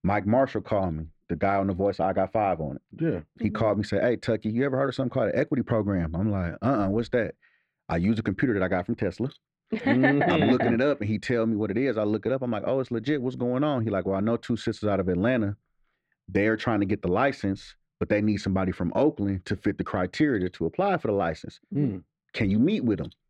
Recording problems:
muffled; slightly; fading above 3 kHz

